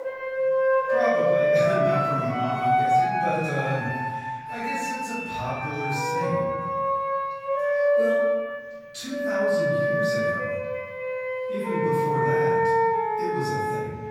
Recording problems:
room echo; strong; dies away in 1.3 s
off-mic speech; far
background music; very loud; throughout; 7 dB above the speech

